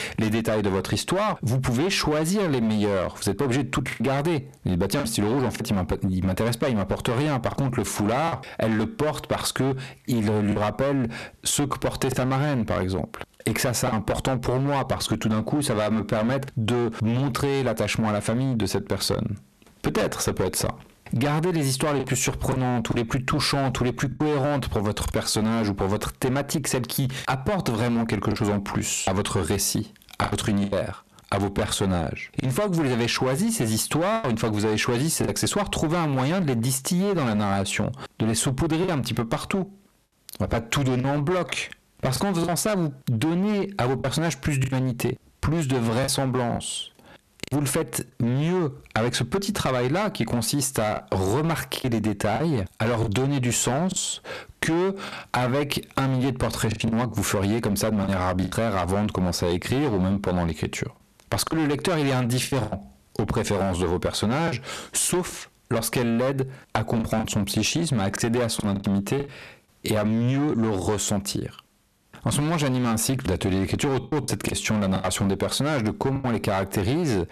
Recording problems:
distortion; heavy; 14% of the sound clipped
squashed, flat; heavily
choppy; occasionally; 4% of the speech affected

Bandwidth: 13.5 kHz